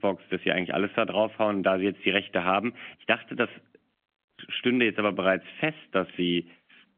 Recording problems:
phone-call audio; nothing above 3.5 kHz

